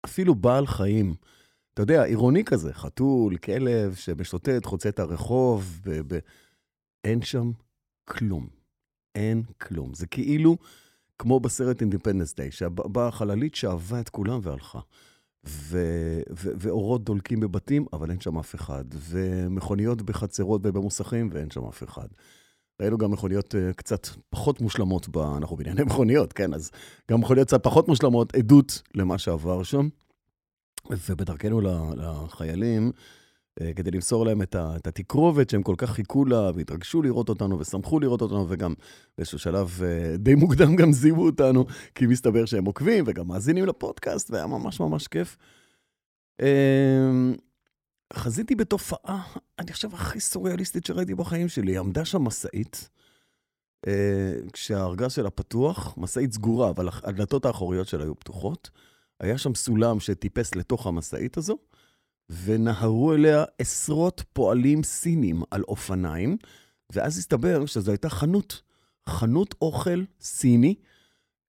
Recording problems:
none

